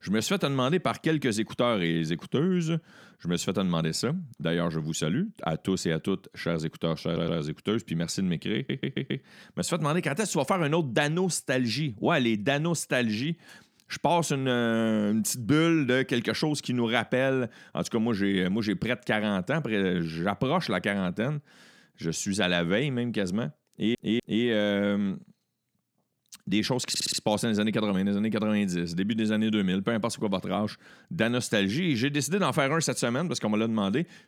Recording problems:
audio stuttering; 4 times, first at 7 s

